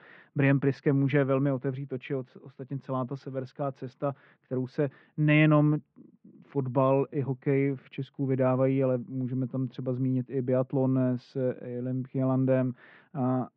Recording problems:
muffled; very; fading above 3 kHz

